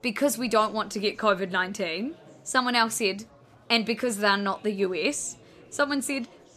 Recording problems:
murmuring crowd; faint; throughout; 25 dB below the speech

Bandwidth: 14.5 kHz